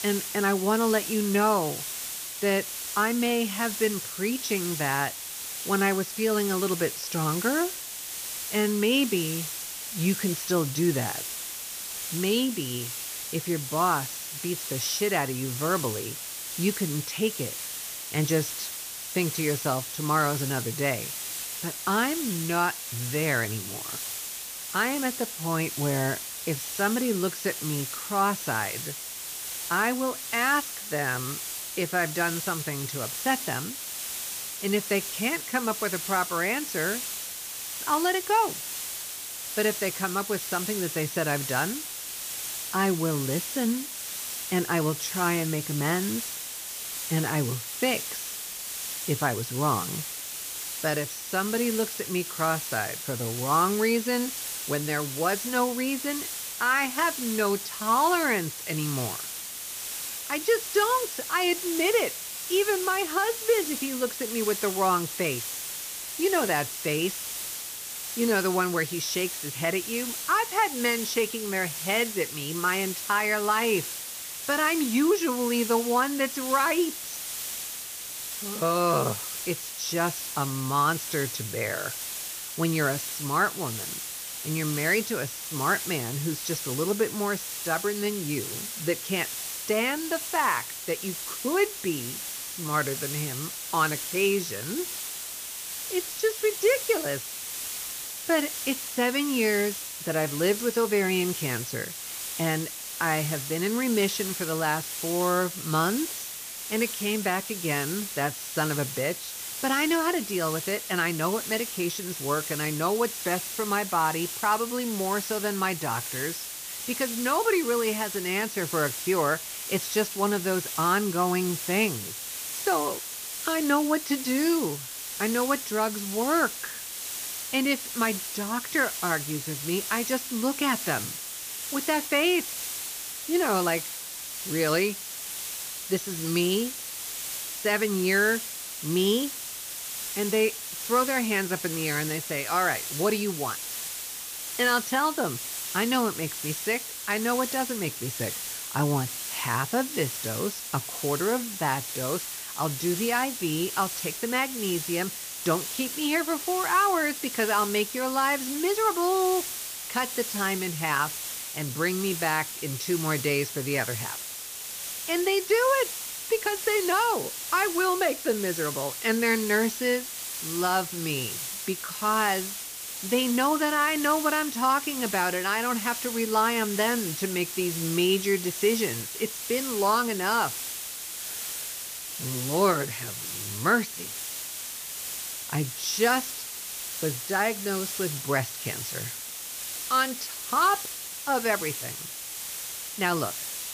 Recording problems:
high frequencies cut off; noticeable; nothing above 6 kHz
hiss; loud; throughout; 5 dB below the speech

